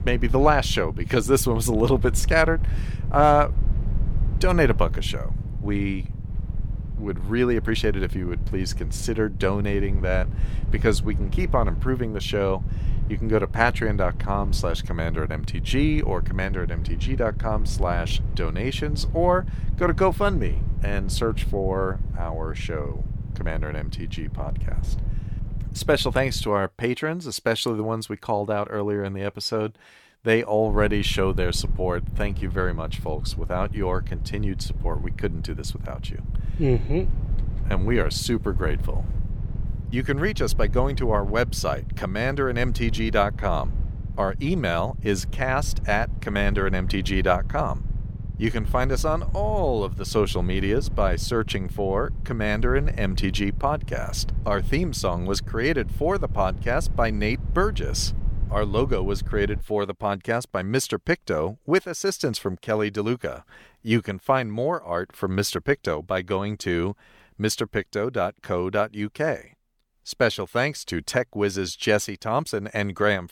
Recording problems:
low rumble; noticeable; until 26 s and from 31 s to 1:00; 20 dB below the speech

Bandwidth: 18.5 kHz